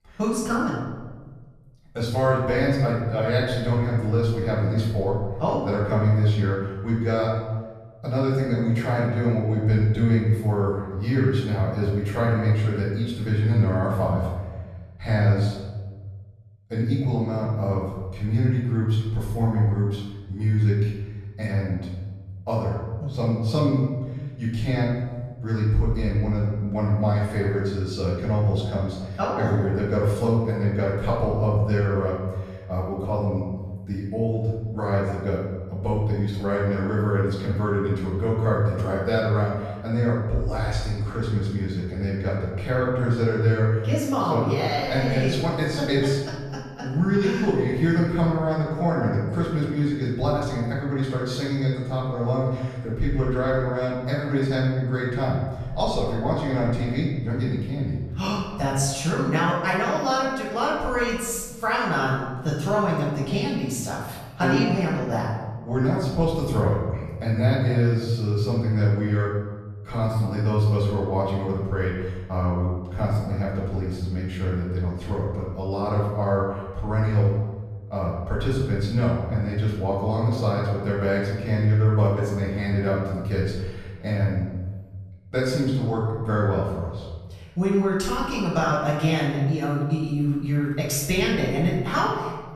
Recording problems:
off-mic speech; far
room echo; noticeable; dies away in 1.3 s

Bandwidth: 13.5 kHz